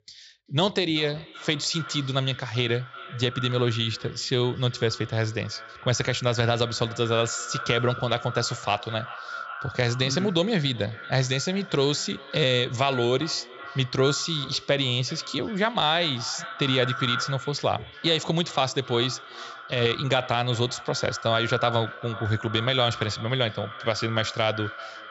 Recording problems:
echo of what is said; noticeable; throughout; 380 ms later, 10 dB below the speech
high frequencies cut off; noticeable; nothing above 8 kHz

